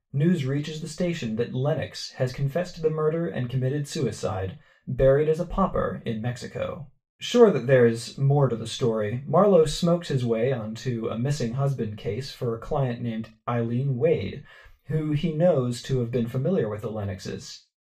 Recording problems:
off-mic speech; far
room echo; very slight; dies away in 0.2 s

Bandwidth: 15 kHz